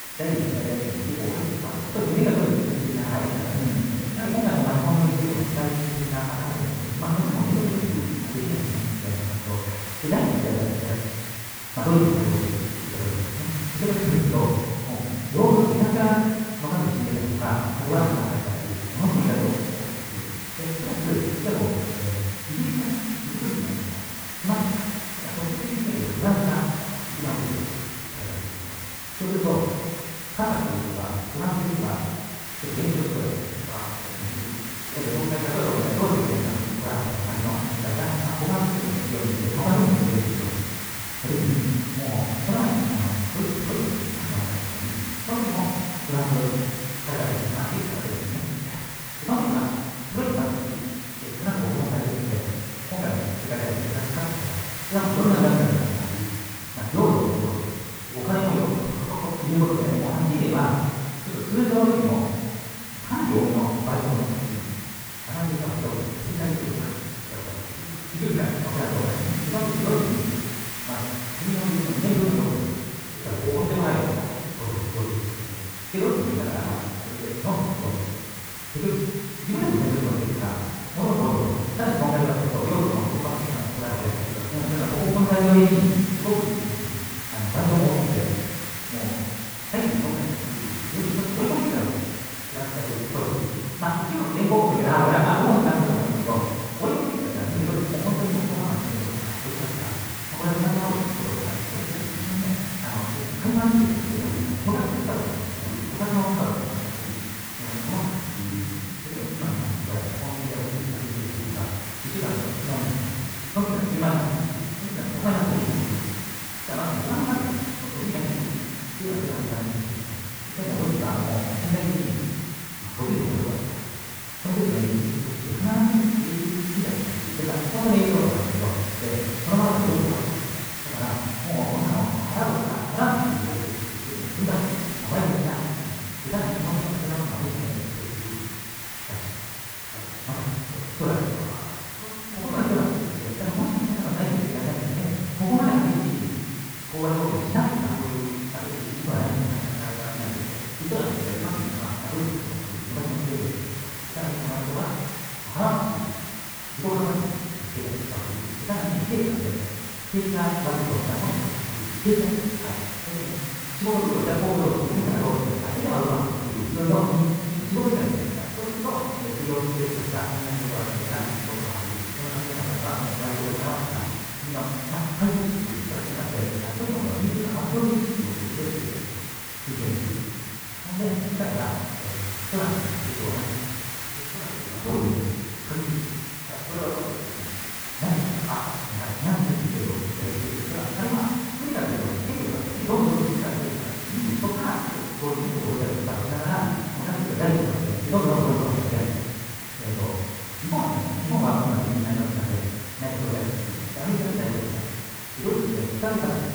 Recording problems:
room echo; strong; dies away in 1.3 s
off-mic speech; far
wrong speed, natural pitch; too fast; 1.7 times normal speed
muffled; slightly; fading above 3.5 kHz
hiss; loud; throughout; 6 dB below the speech

